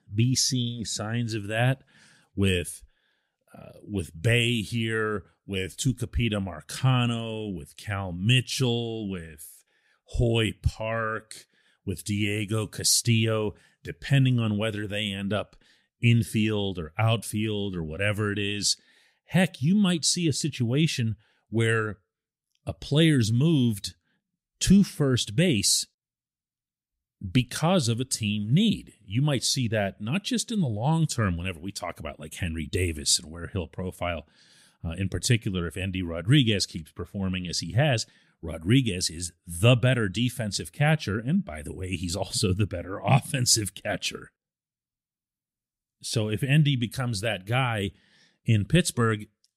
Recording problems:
none

